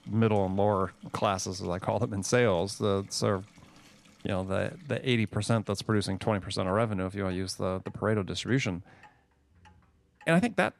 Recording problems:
household noises; faint; throughout; 30 dB below the speech

